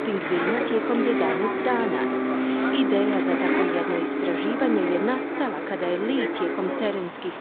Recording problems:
phone-call audio
traffic noise; very loud; throughout; 2 dB above the speech

